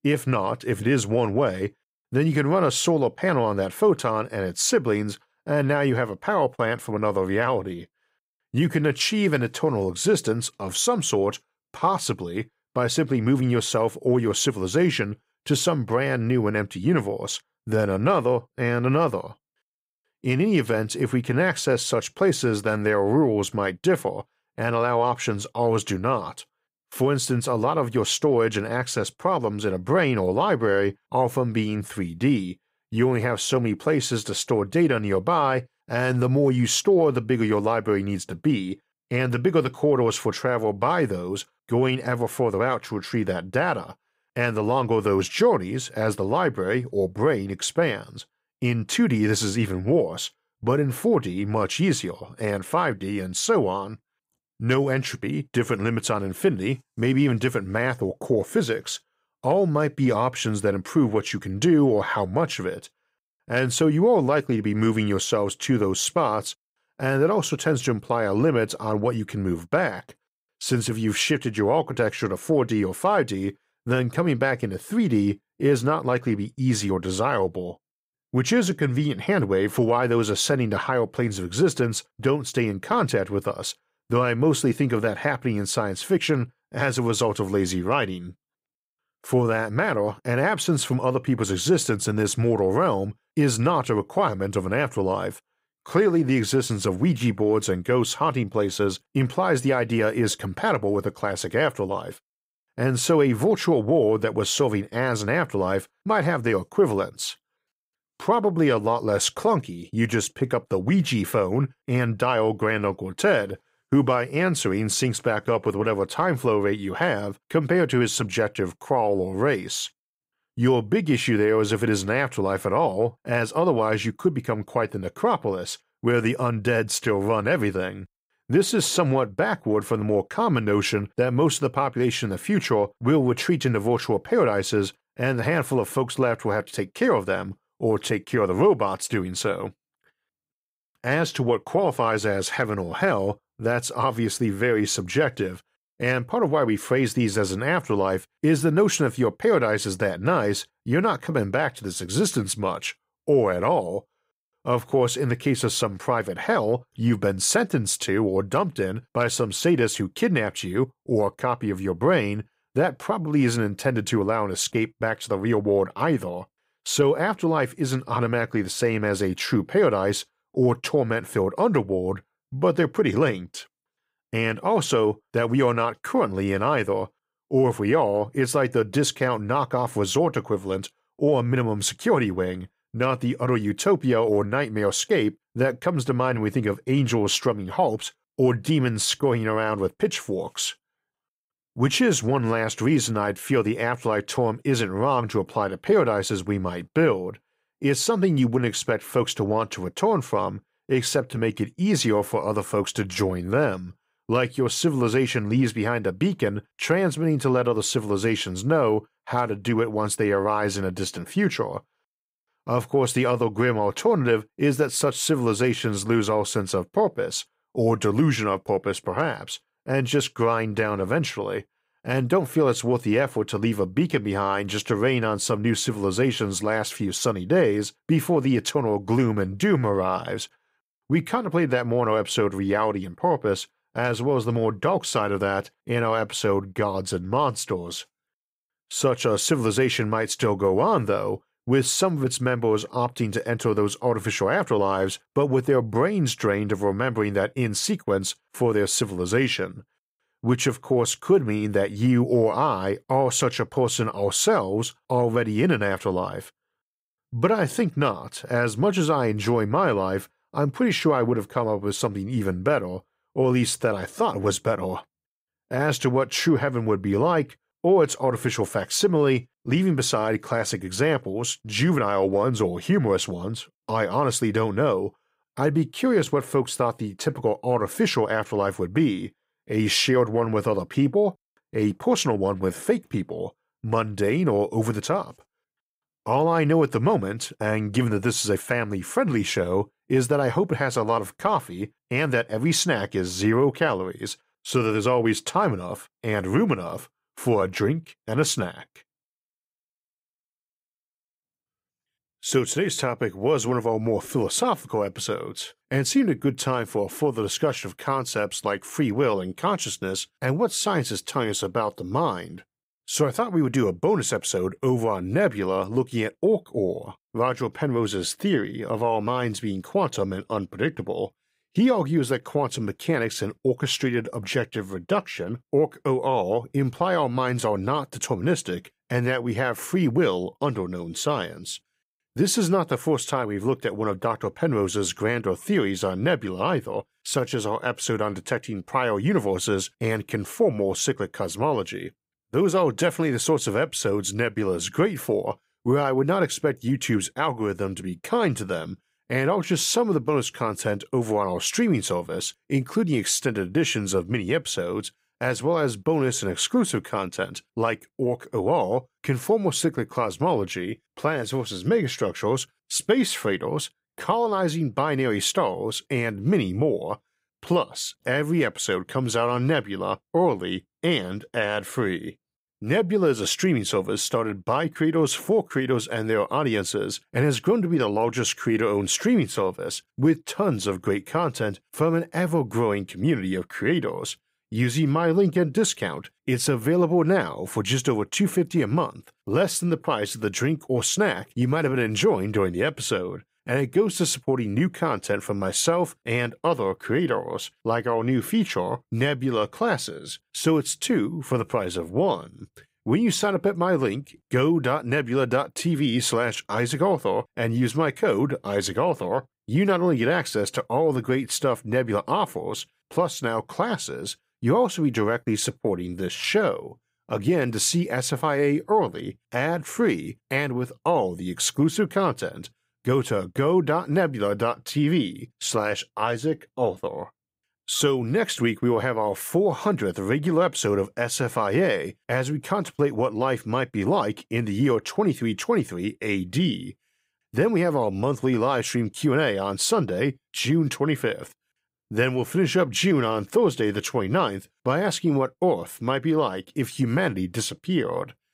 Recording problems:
none

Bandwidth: 15.5 kHz